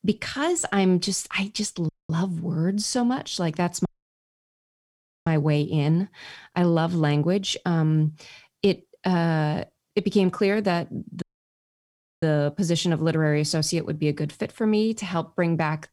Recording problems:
audio cutting out; at 2 s, at 4 s for 1.5 s and at 11 s for 1 s

